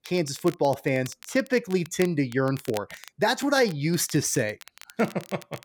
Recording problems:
crackle, like an old record; noticeable; 20 dB below the speech

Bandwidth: 18.5 kHz